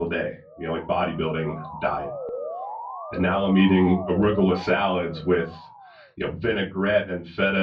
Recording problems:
off-mic speech; far
muffled; slightly; fading above 4 kHz
room echo; very slight; dies away in 0.3 s
abrupt cut into speech; at the start and the end
siren; noticeable; from 0.5 to 6 s; peak 8 dB below the speech

